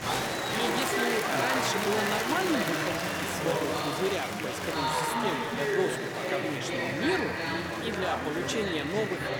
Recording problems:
murmuring crowd; very loud; throughout; 4 dB above the speech

